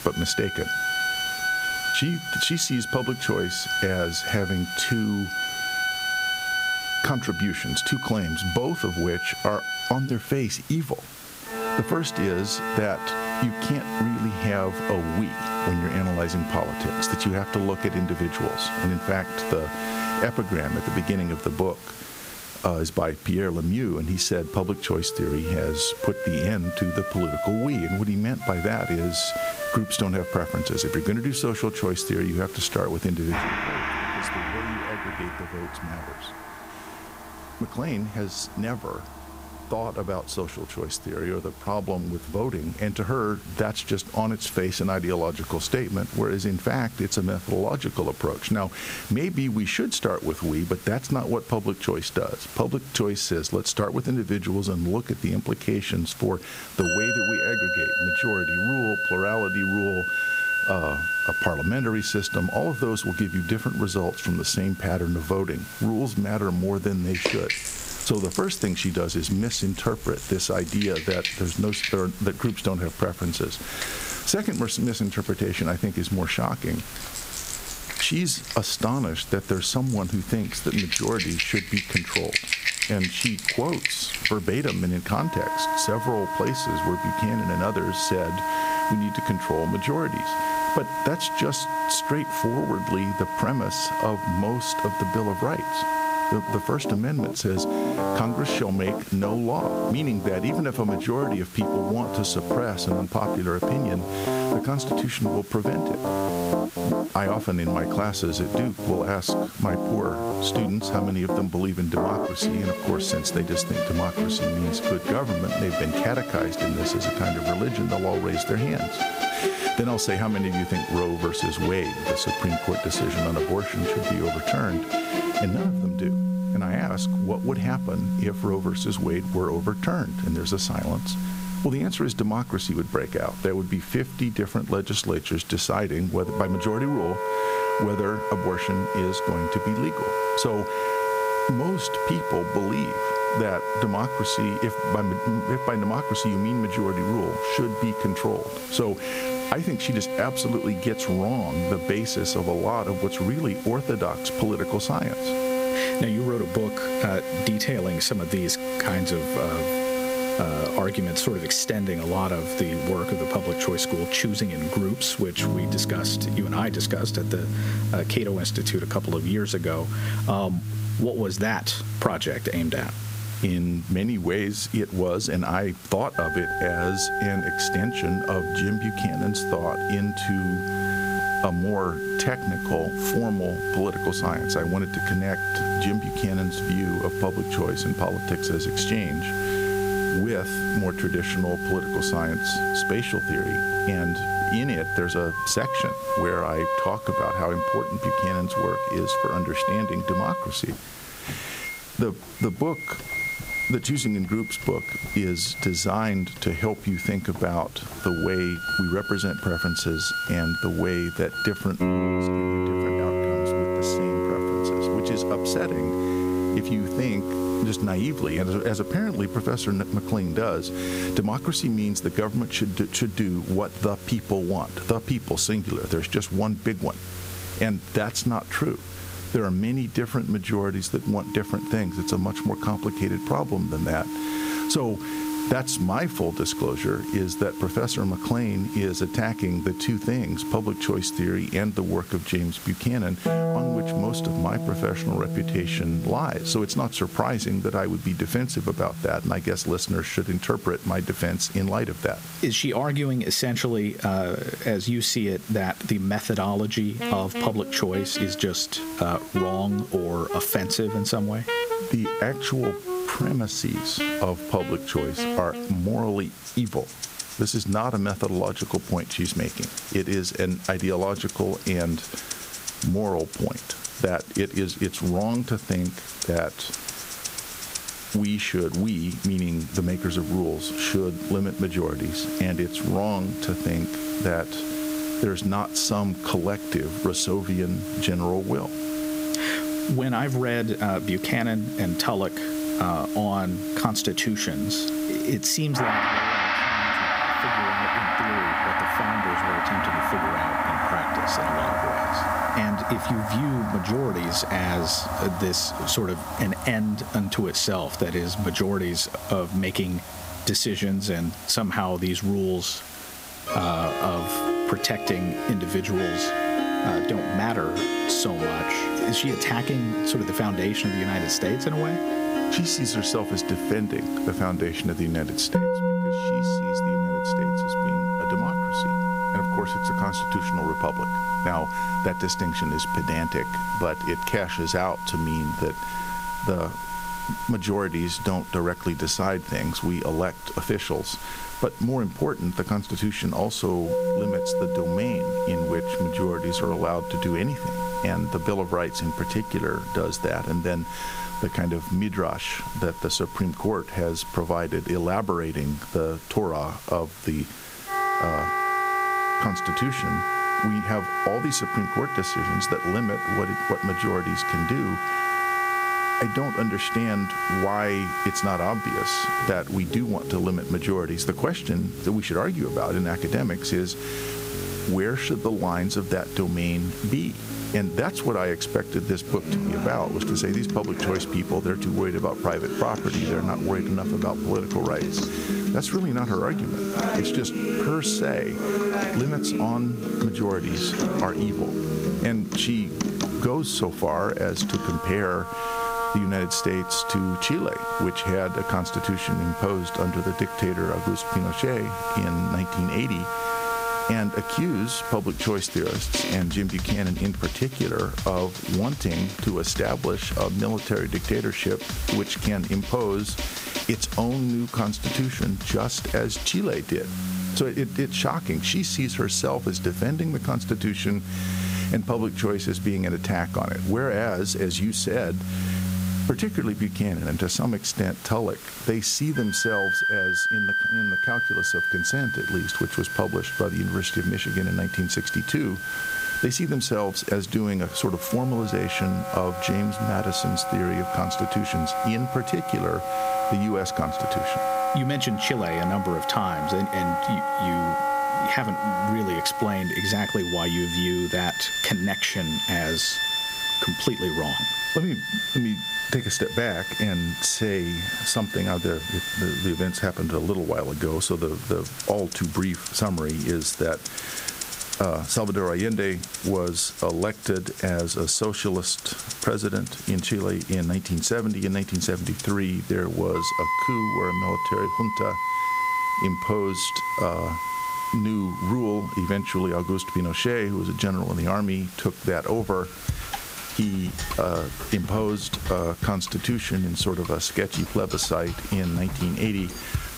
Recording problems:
squashed, flat; somewhat, background pumping
background music; loud; throughout; 2 dB below the speech
hiss; noticeable; throughout; 15 dB below the speech

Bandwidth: 15.5 kHz